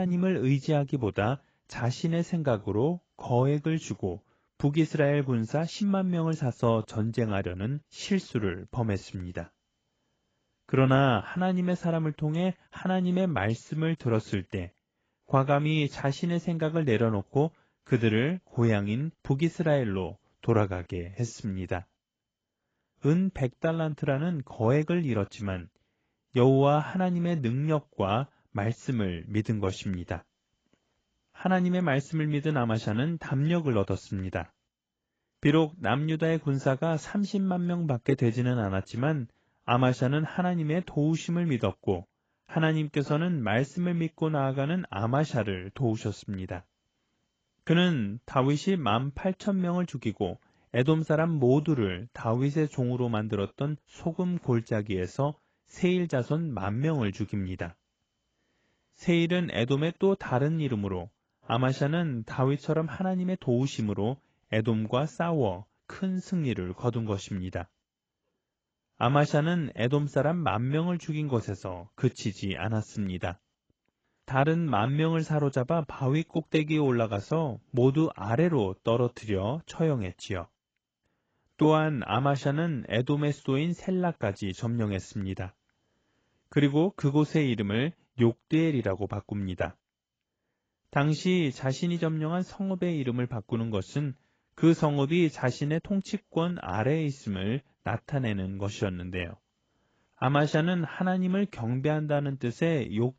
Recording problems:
garbled, watery; badly; nothing above 7.5 kHz
abrupt cut into speech; at the start

